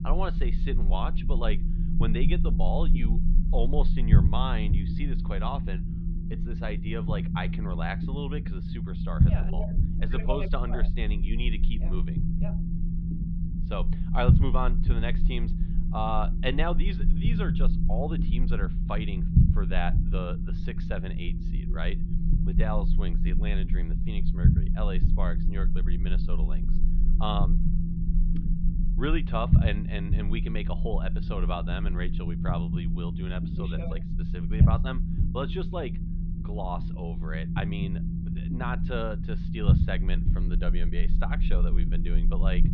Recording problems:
muffled; slightly; fading above 3.5 kHz
low rumble; loud; throughout; 5 dB below the speech

